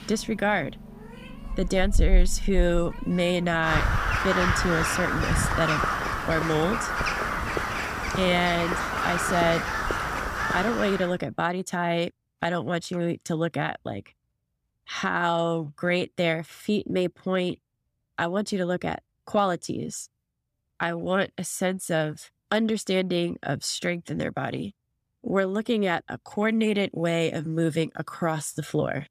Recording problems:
animal sounds; loud; until 11 s; as loud as the speech

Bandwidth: 15 kHz